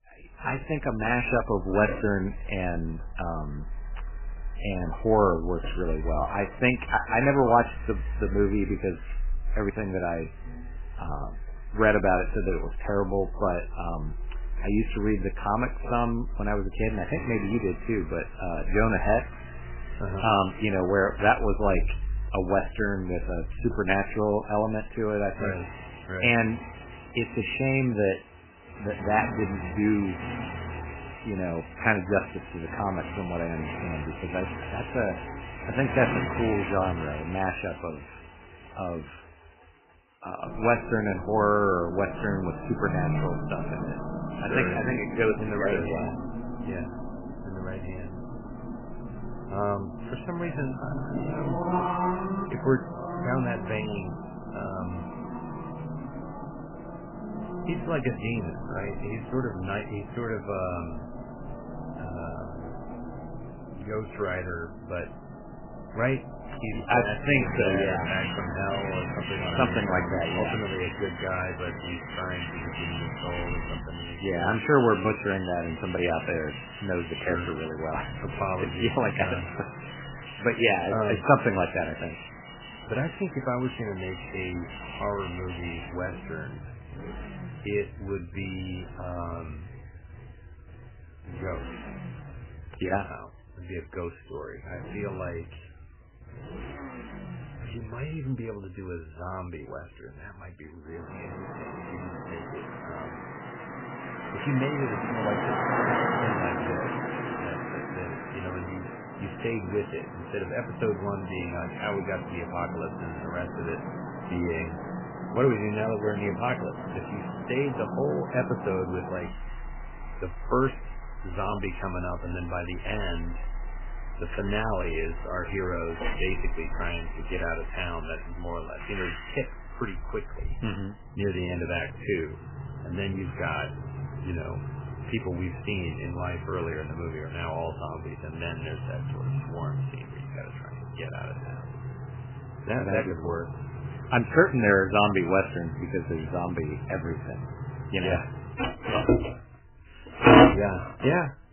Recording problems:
garbled, watery; badly; nothing above 3 kHz
traffic noise; loud; throughout; 6 dB below the speech

